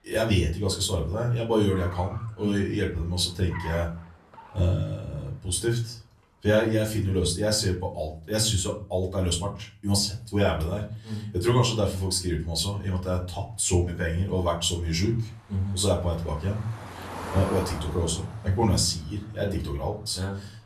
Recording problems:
off-mic speech; far
room echo; very slight; dies away in 0.4 s
traffic noise; noticeable; throughout; 15 dB below the speech

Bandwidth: 13.5 kHz